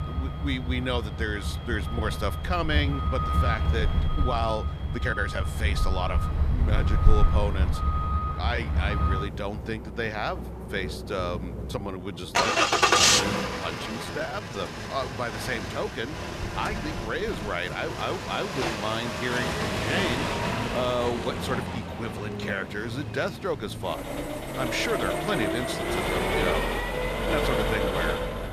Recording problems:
traffic noise; very loud; throughout; 4 dB above the speech
uneven, jittery; strongly; from 2.5 to 15 s

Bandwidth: 14.5 kHz